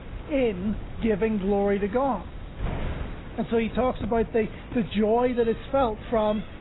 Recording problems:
garbled, watery; badly; nothing above 4 kHz
wind noise on the microphone; occasional gusts; 20 dB below the speech
animal sounds; faint; throughout; 25 dB below the speech

